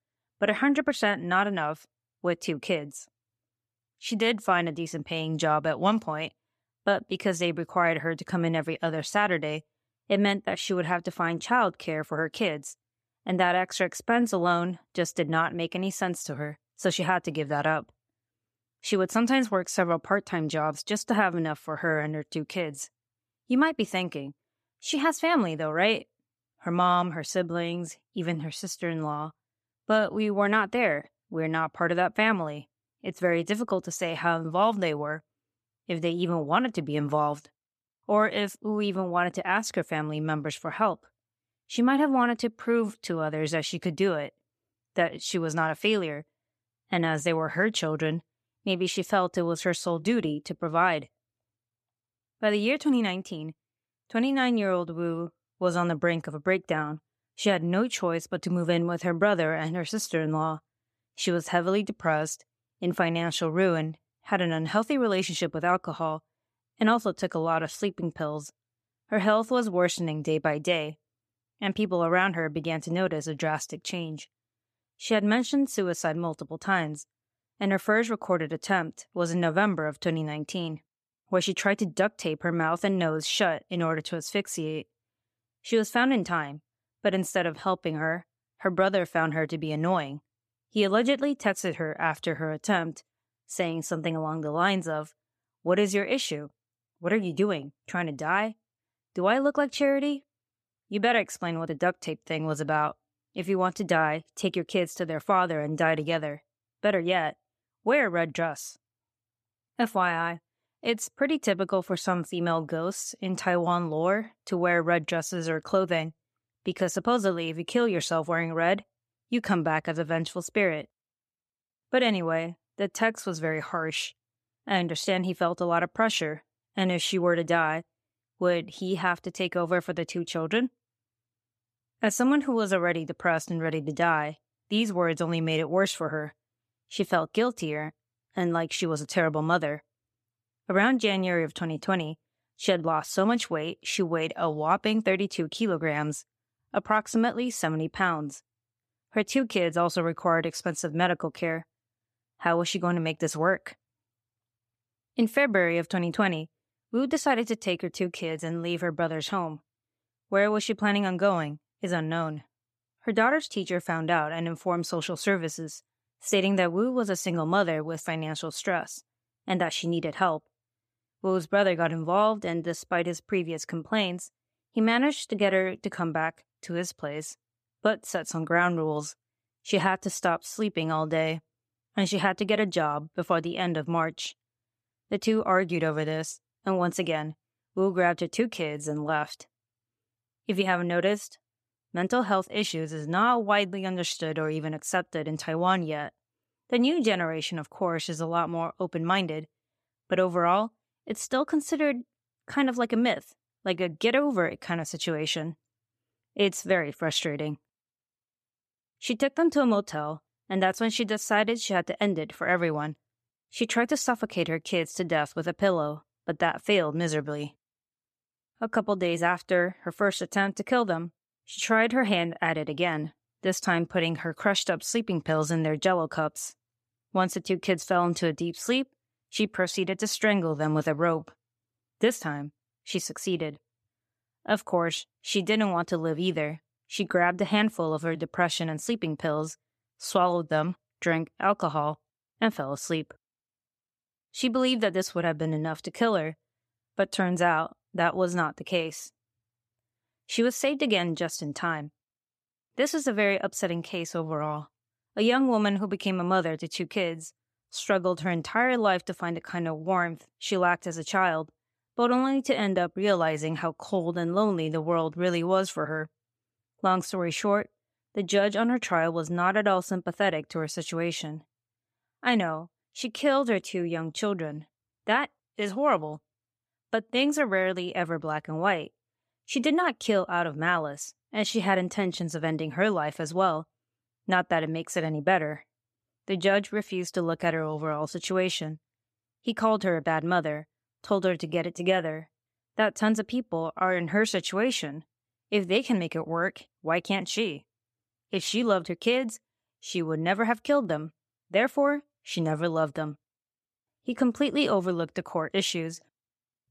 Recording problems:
none

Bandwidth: 14.5 kHz